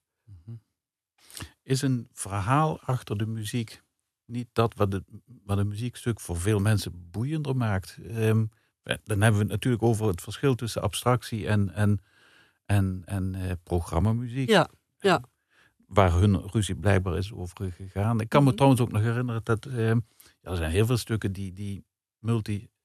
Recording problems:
none

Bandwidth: 13.5 kHz